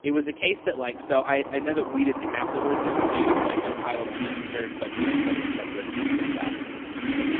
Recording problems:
phone-call audio; poor line; nothing above 3.5 kHz
traffic noise; very loud; throughout; as loud as the speech

